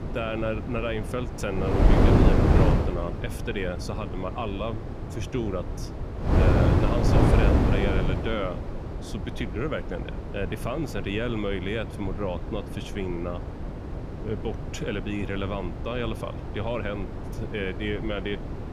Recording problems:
wind noise on the microphone; heavy; 1 dB below the speech

